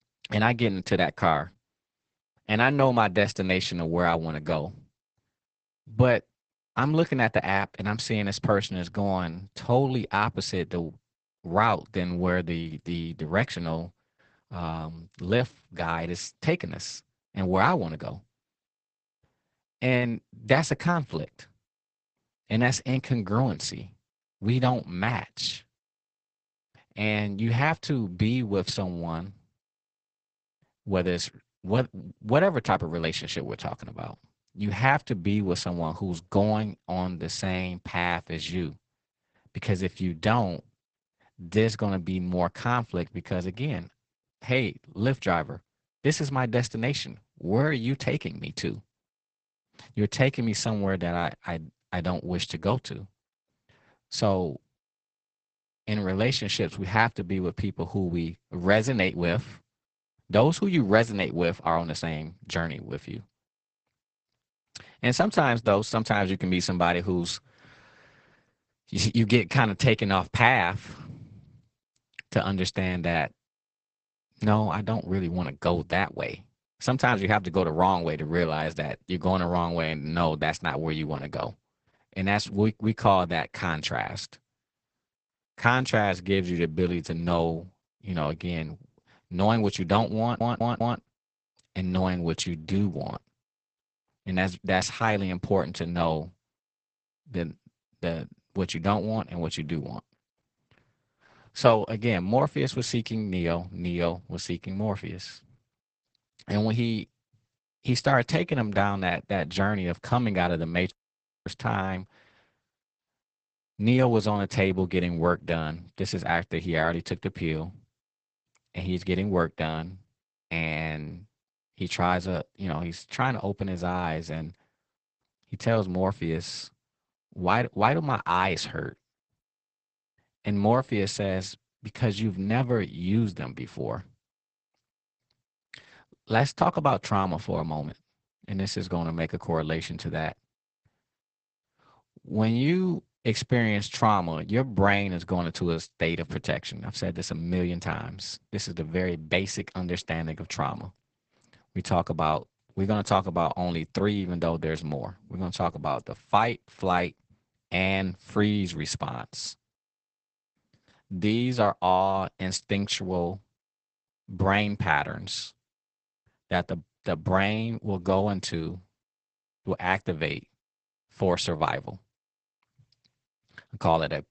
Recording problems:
garbled, watery; badly; nothing above 8 kHz
audio stuttering; at 1:30
audio cutting out; at 1:51 for 0.5 s

